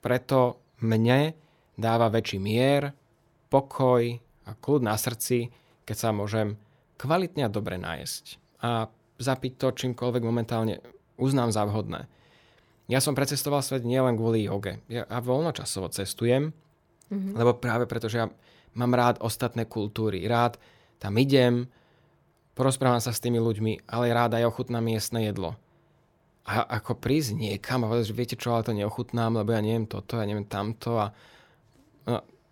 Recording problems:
none

